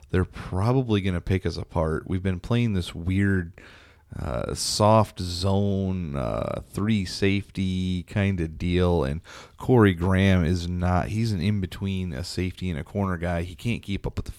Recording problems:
none

